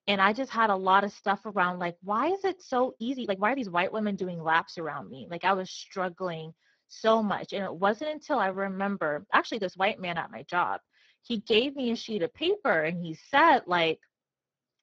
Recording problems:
garbled, watery; badly
uneven, jittery; strongly; from 3 to 13 s

